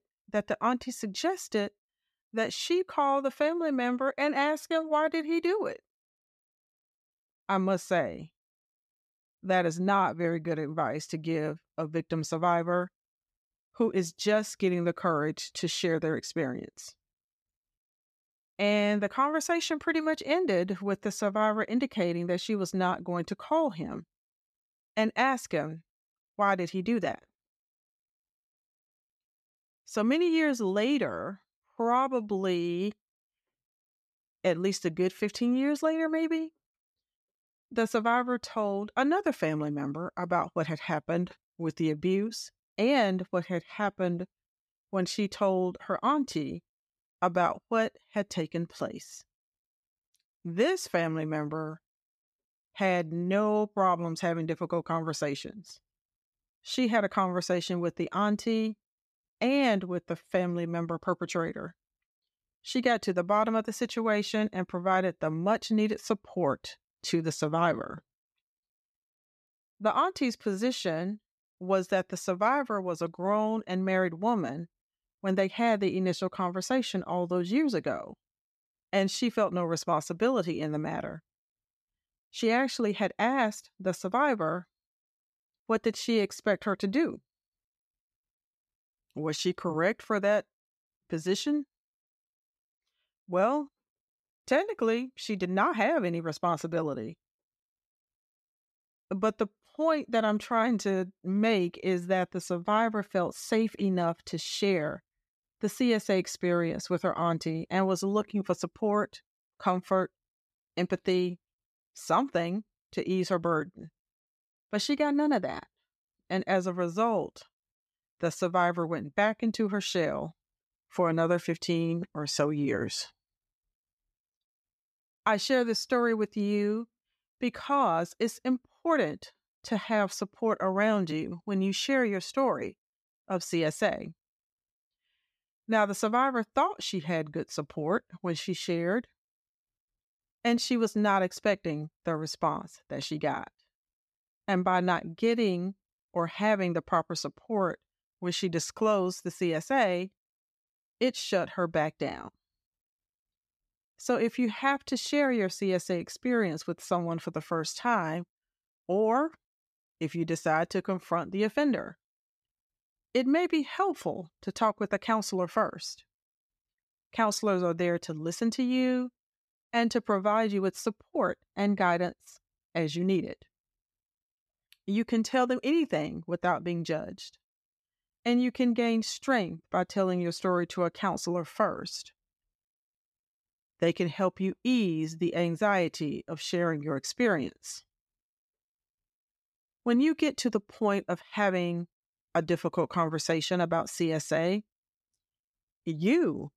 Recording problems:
none

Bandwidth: 14.5 kHz